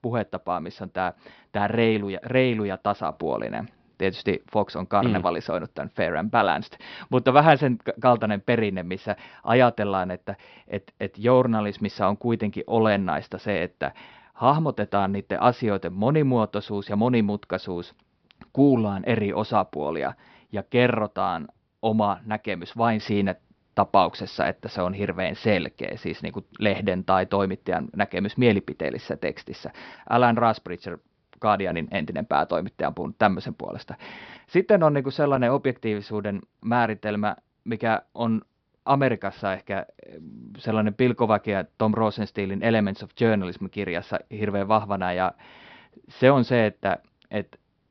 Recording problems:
high frequencies cut off; noticeable; nothing above 5.5 kHz

